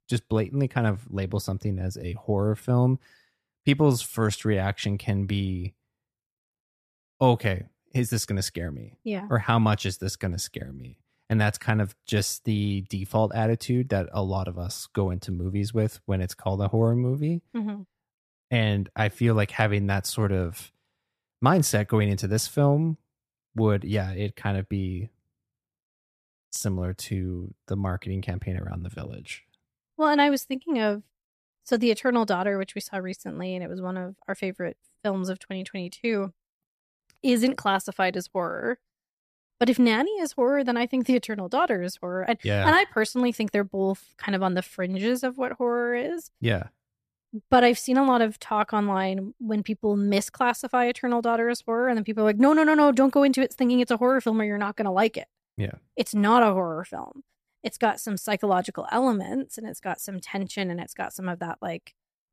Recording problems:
none

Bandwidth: 14.5 kHz